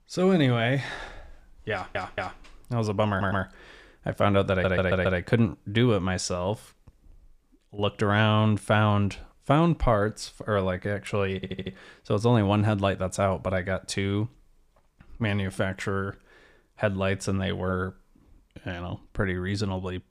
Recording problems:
audio stuttering; 4 times, first at 1.5 s

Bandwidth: 14.5 kHz